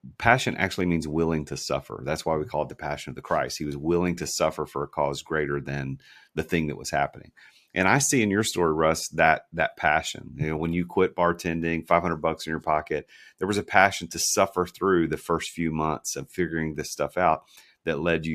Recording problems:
abrupt cut into speech; at the end

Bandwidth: 14.5 kHz